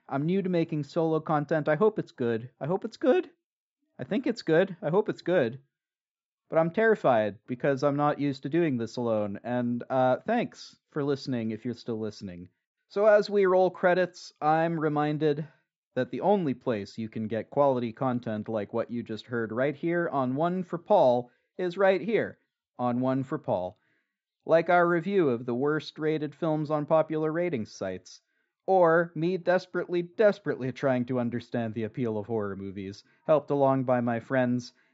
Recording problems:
high frequencies cut off; noticeable; nothing above 8 kHz
muffled; very slightly; fading above 2 kHz

